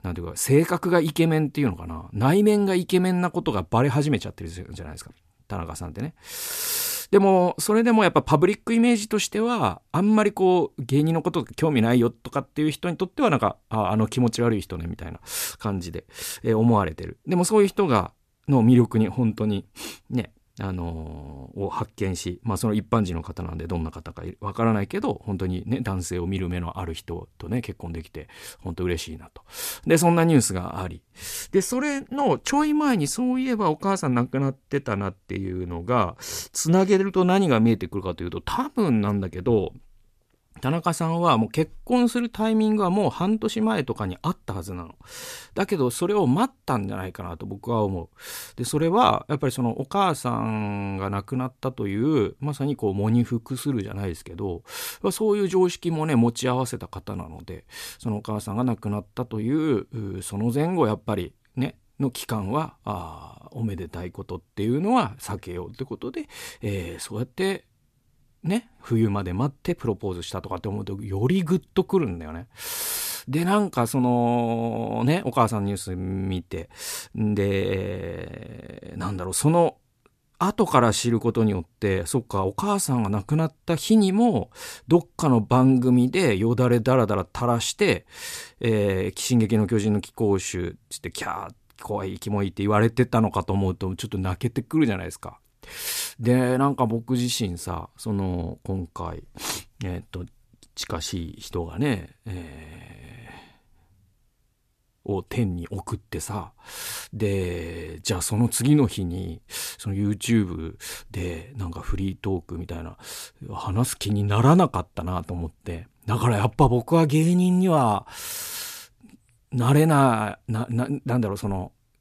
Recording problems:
none

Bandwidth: 14.5 kHz